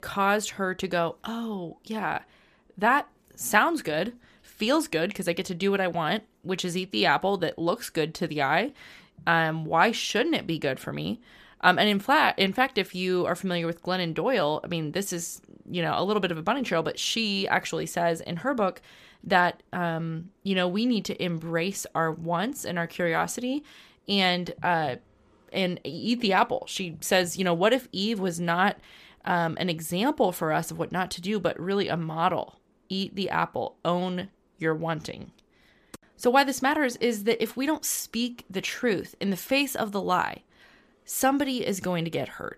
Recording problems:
none

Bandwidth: 14.5 kHz